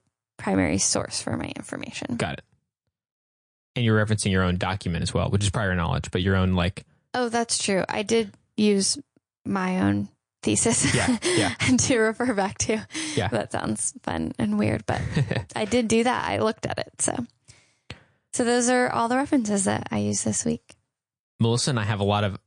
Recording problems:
garbled, watery; slightly; nothing above 9 kHz

